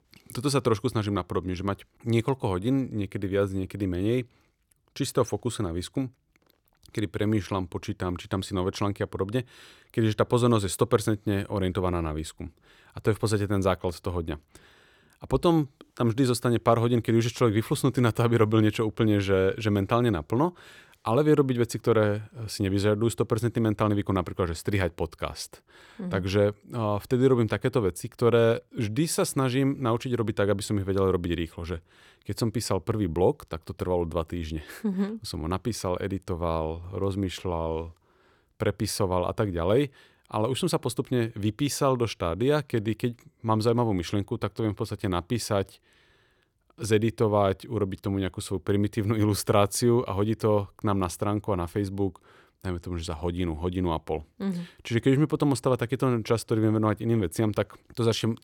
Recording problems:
none

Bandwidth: 17 kHz